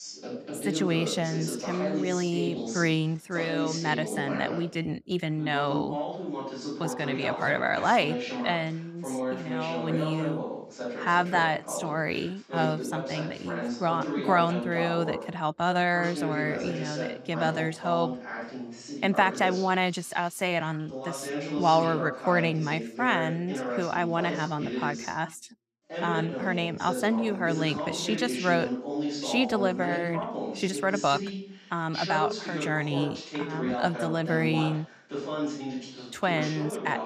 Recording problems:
voice in the background; loud; throughout; 6 dB below the speech

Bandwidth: 15.5 kHz